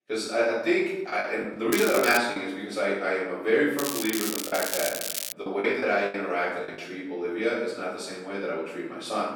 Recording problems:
off-mic speech; far
room echo; noticeable; dies away in 0.9 s
thin; very slightly; fading below 250 Hz
crackling; loud; at 1.5 s and from 4 to 5.5 s; 4 dB below the speech
choppy; very; from 1 to 2.5 s and from 4.5 to 7 s; 18% of the speech affected

